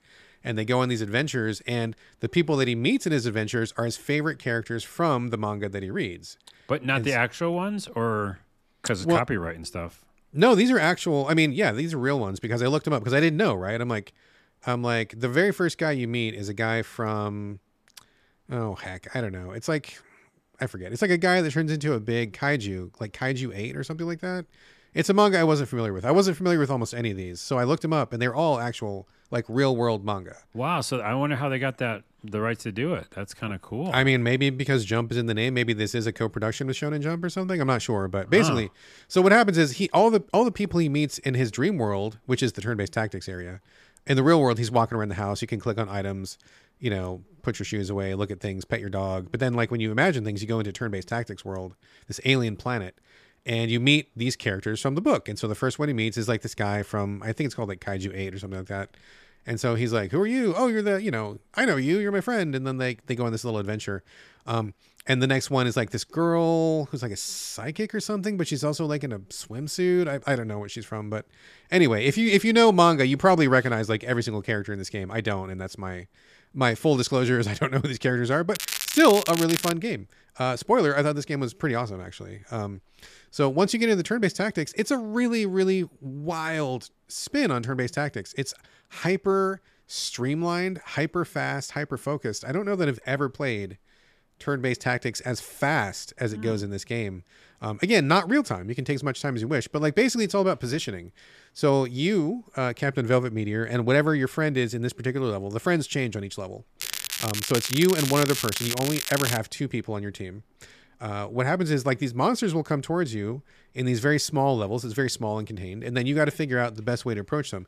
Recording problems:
crackling; loud; from 1:19 to 1:20 and from 1:47 to 1:49; 4 dB below the speech

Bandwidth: 14.5 kHz